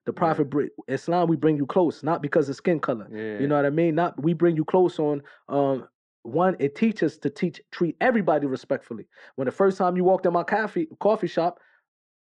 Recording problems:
muffled; very; fading above 2.5 kHz

